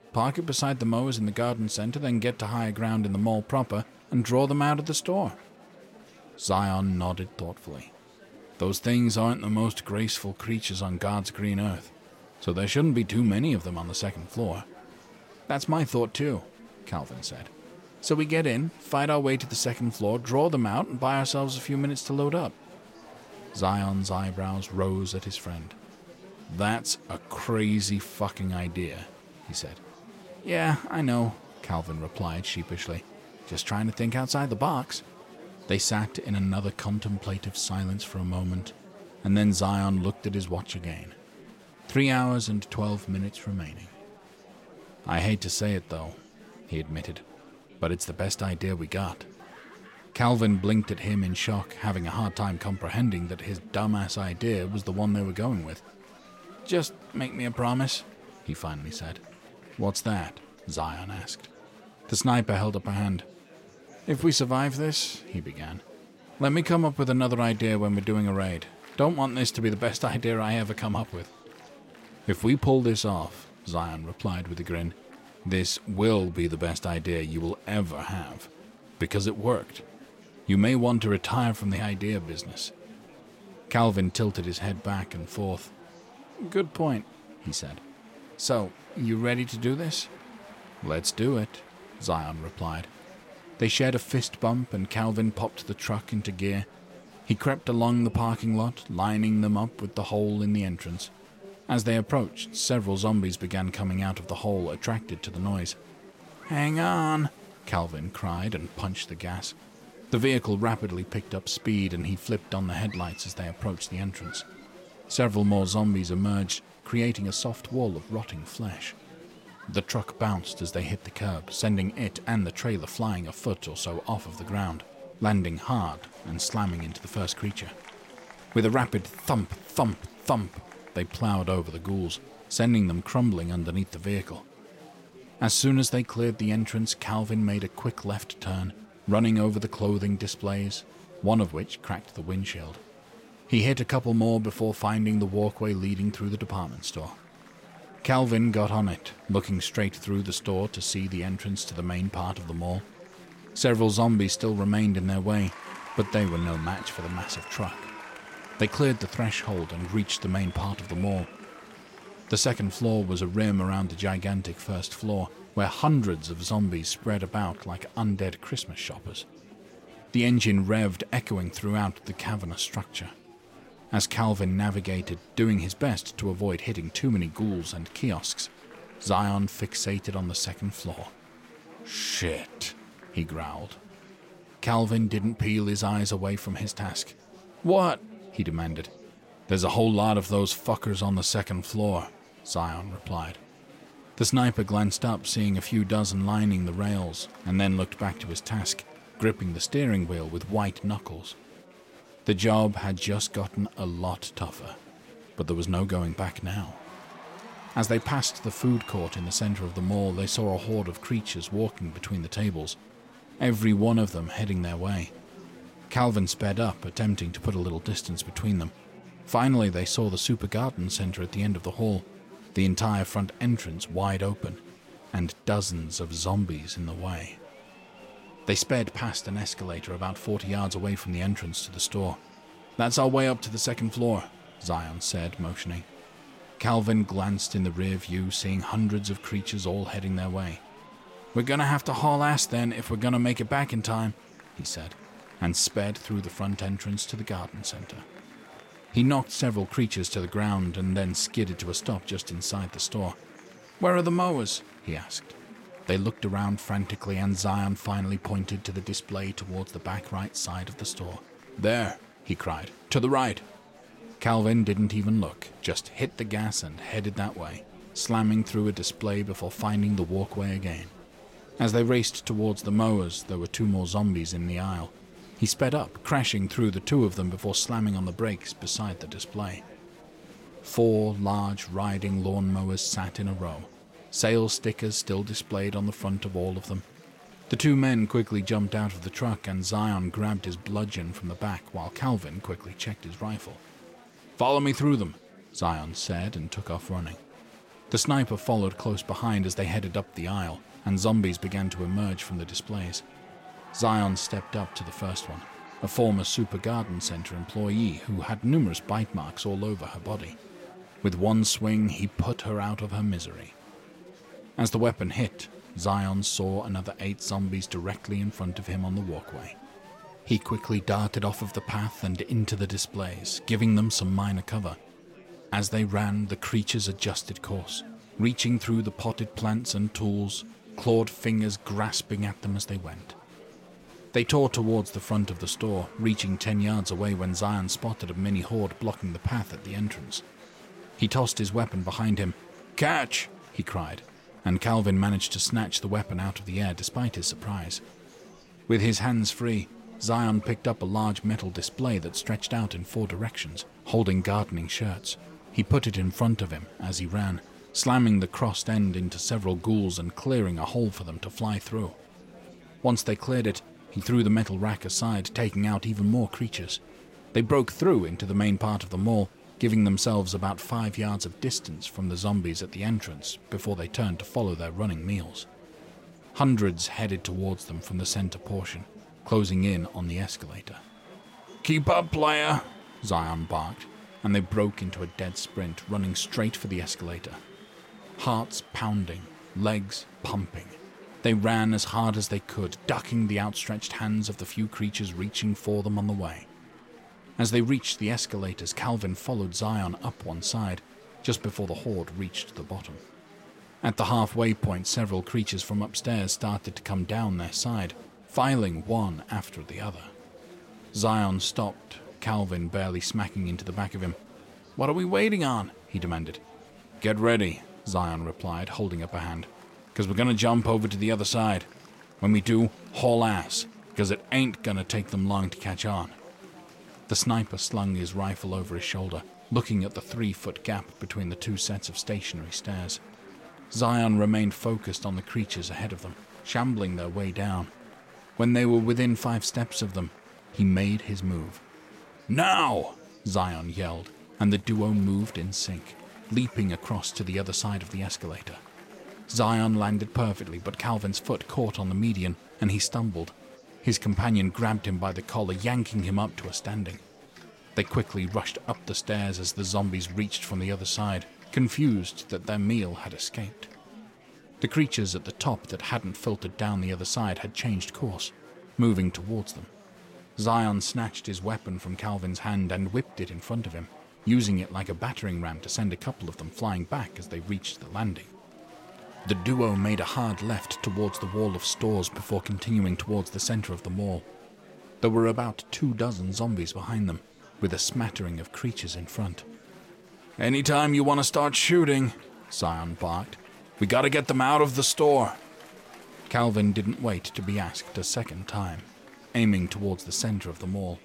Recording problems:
murmuring crowd; faint; throughout; 20 dB below the speech

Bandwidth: 16 kHz